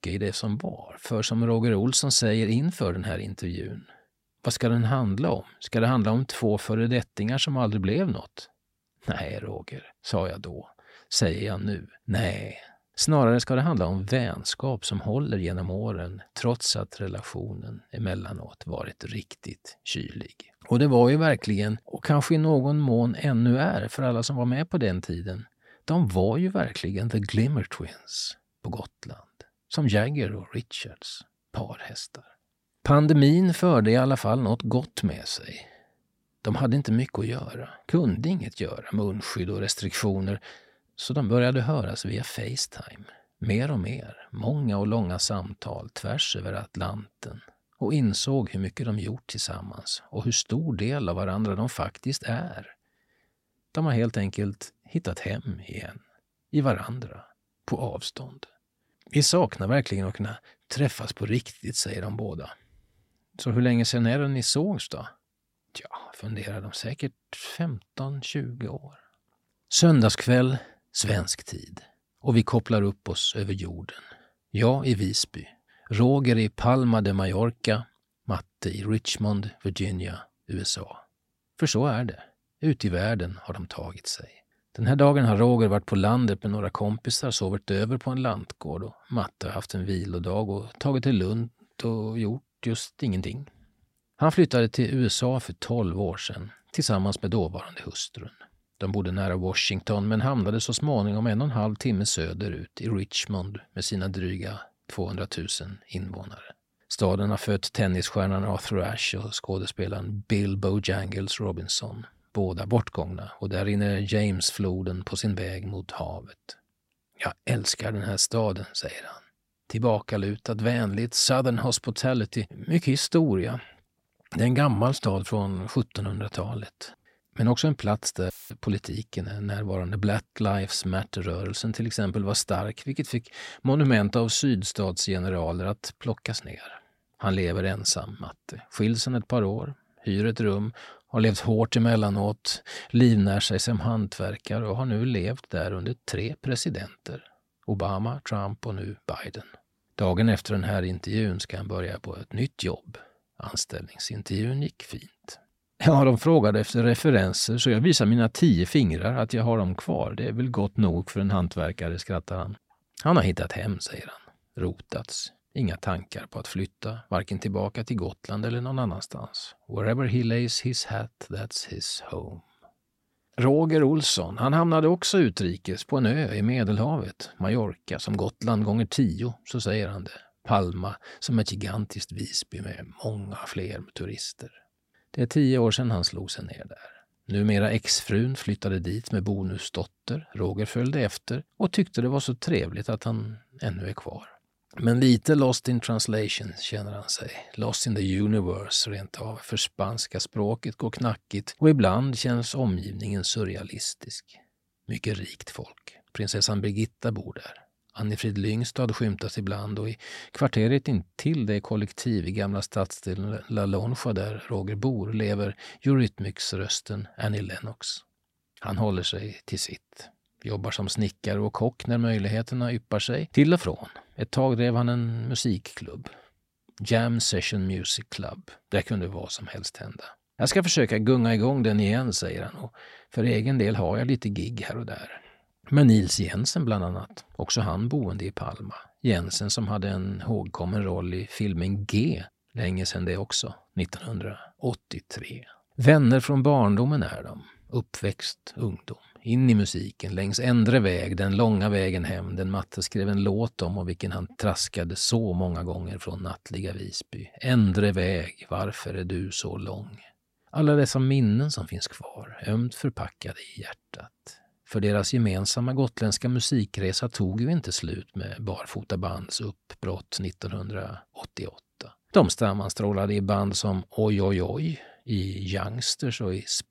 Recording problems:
audio cutting out; filled with static; at 2:08

